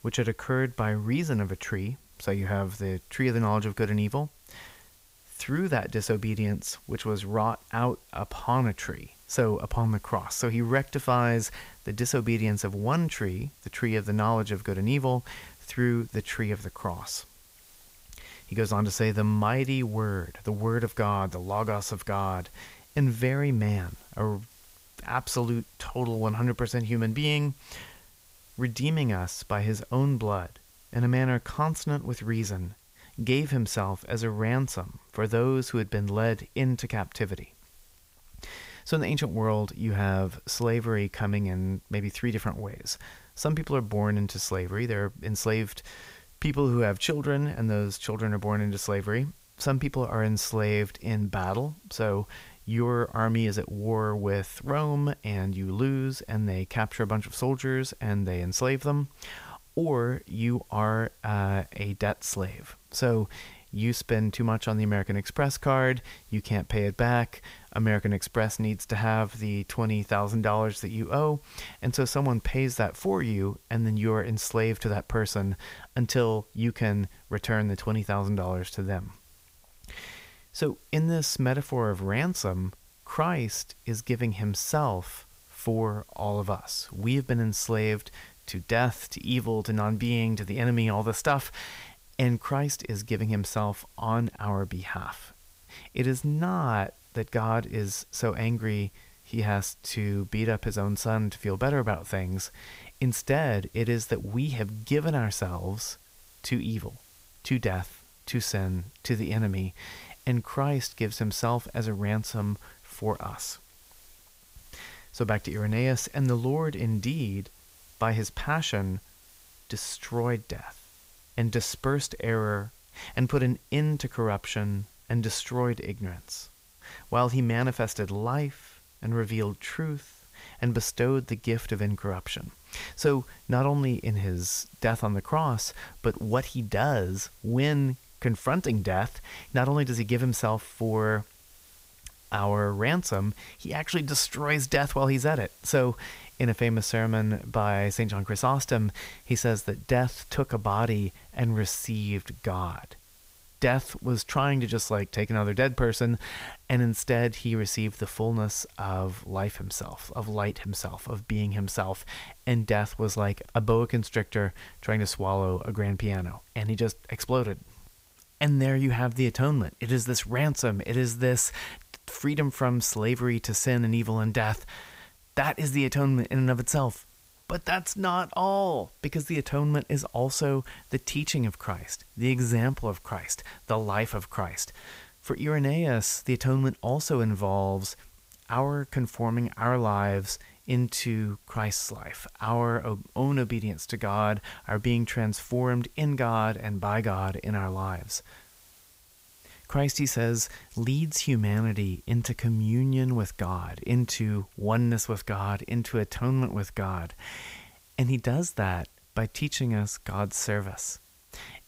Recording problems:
hiss; faint; throughout; 25 dB below the speech

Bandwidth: 15.5 kHz